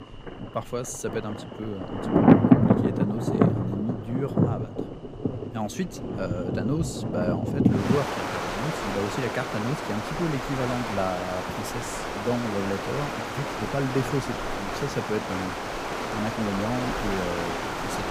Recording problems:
rain or running water; very loud; throughout; 4 dB above the speech

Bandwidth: 15.5 kHz